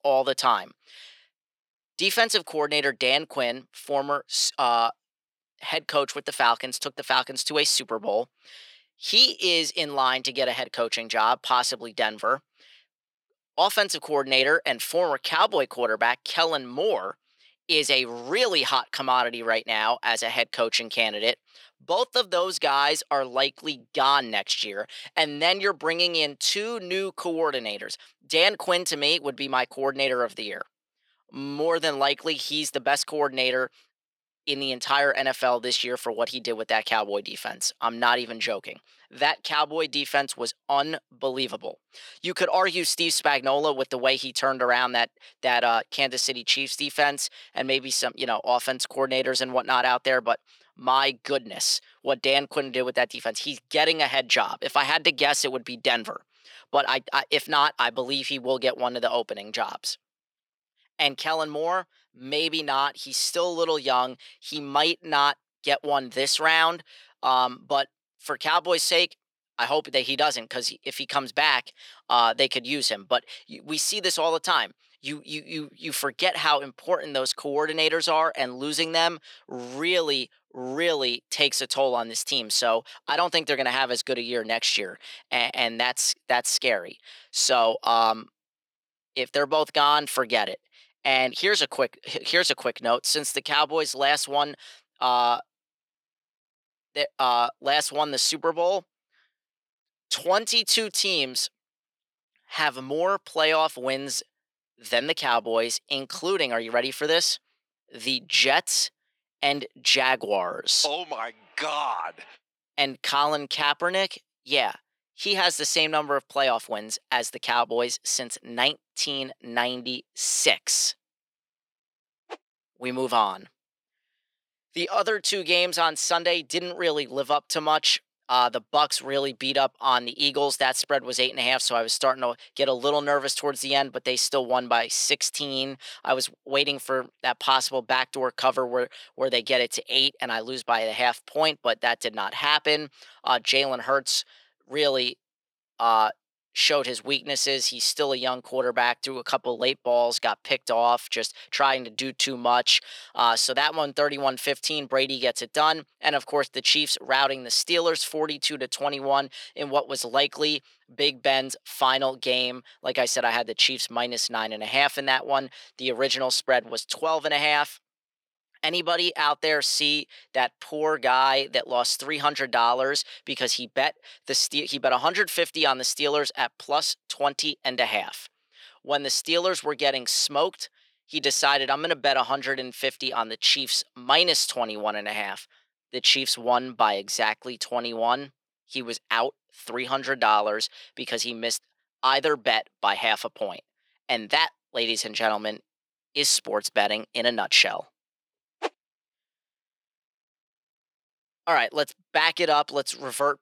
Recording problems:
thin; somewhat; fading below 500 Hz

